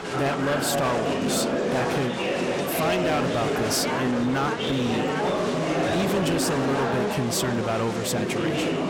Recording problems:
distortion; slight; 14% of the sound clipped
murmuring crowd; very loud; throughout; 1 dB above the speech

